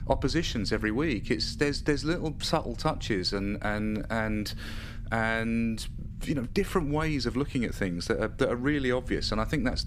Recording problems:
low rumble; faint; throughout; 25 dB below the speech

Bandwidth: 15 kHz